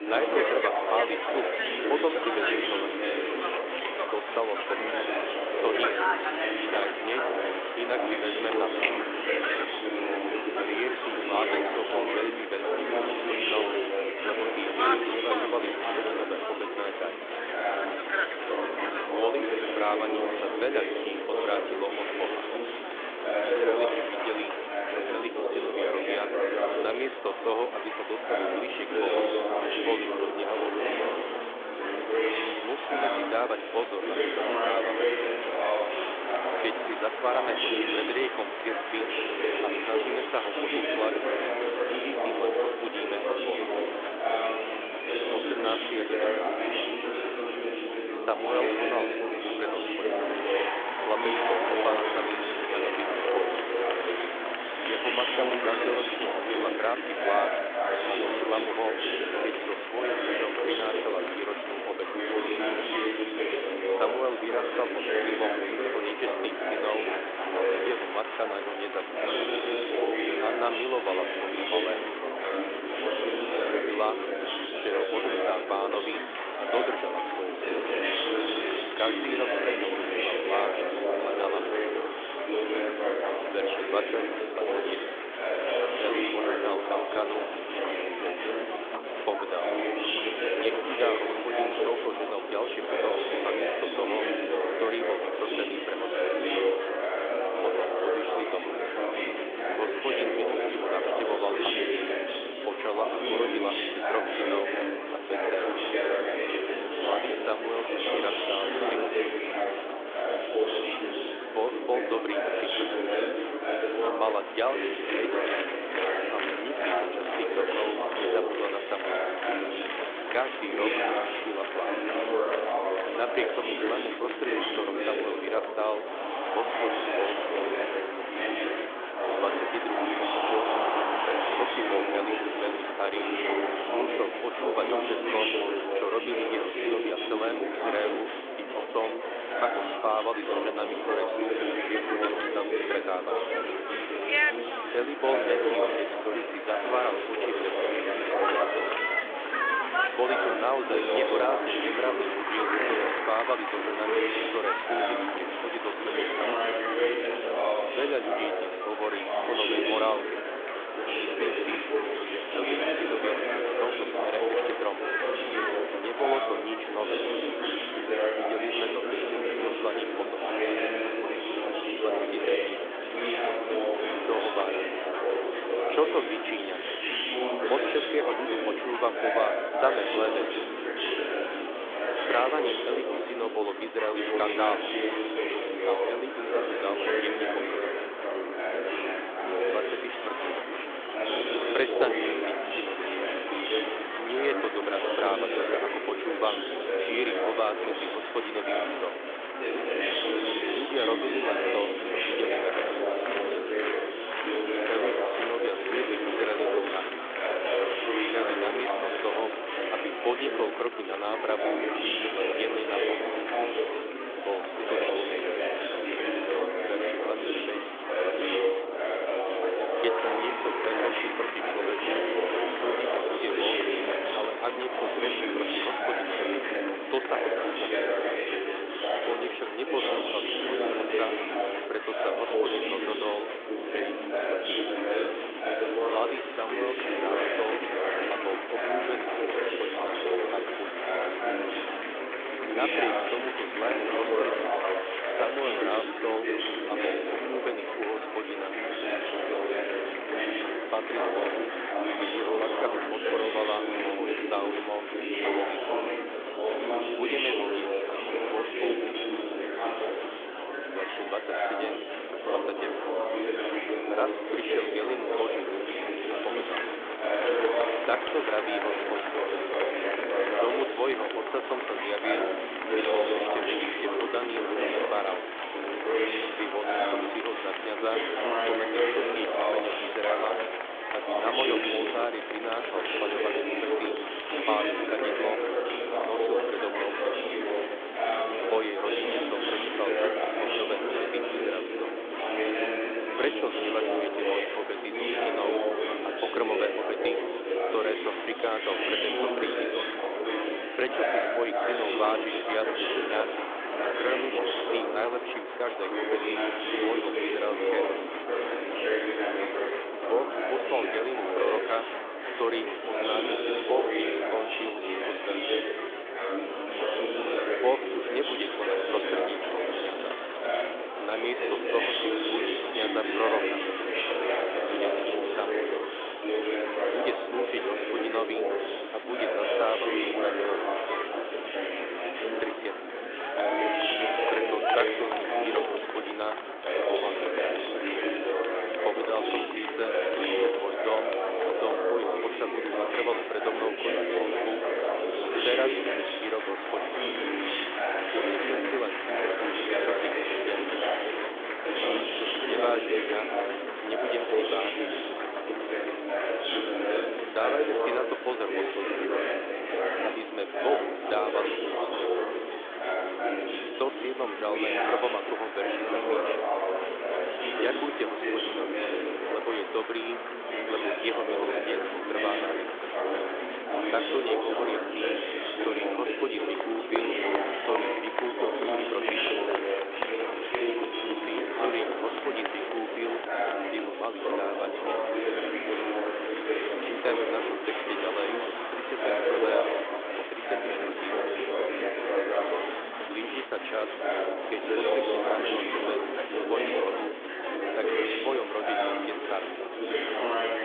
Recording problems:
thin; very; fading below 300 Hz
phone-call audio; nothing above 3.5 kHz
murmuring crowd; very loud; throughout; 4 dB above the speech

